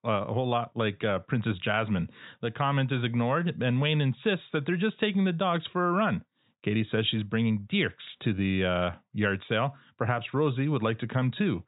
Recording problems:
high frequencies cut off; severe; nothing above 4 kHz

